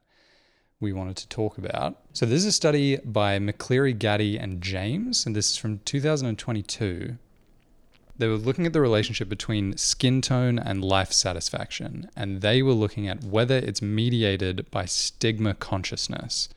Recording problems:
none

